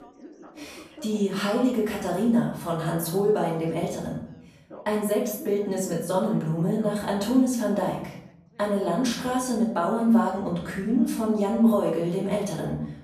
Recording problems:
off-mic speech; far
room echo; noticeable; dies away in 0.7 s
background chatter; faint; throughout; 2 voices, 20 dB below the speech

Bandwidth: 14.5 kHz